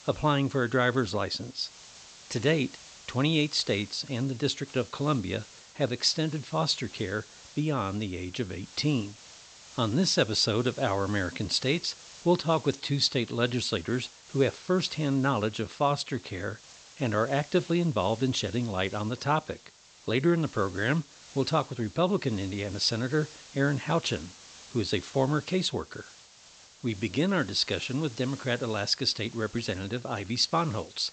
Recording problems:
high frequencies cut off; noticeable; nothing above 8 kHz
hiss; noticeable; throughout; 20 dB below the speech

